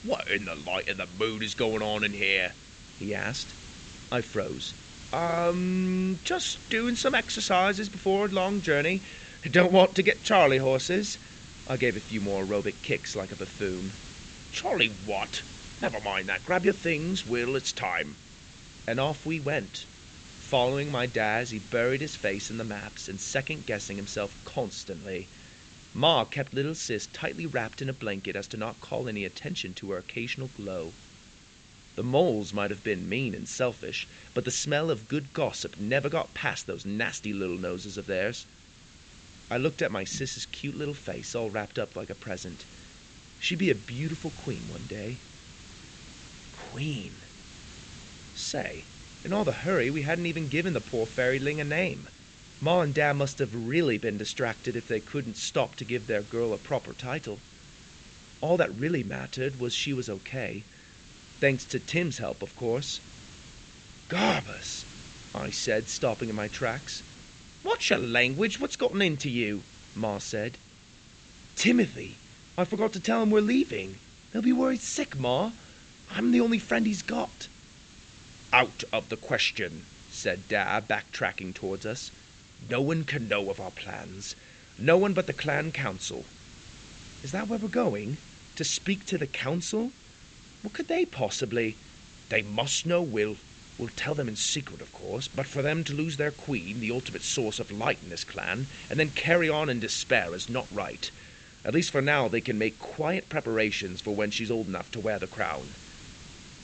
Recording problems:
high frequencies cut off; noticeable; nothing above 8 kHz
hiss; noticeable; throughout; 20 dB below the speech

